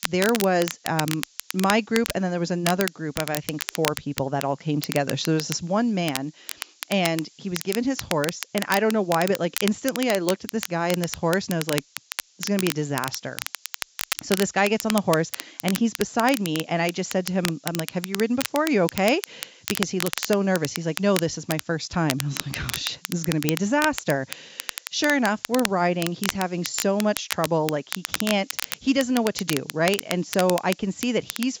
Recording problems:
high frequencies cut off; noticeable; nothing above 7.5 kHz
crackle, like an old record; loud; 7 dB below the speech
hiss; faint; throughout; 30 dB below the speech

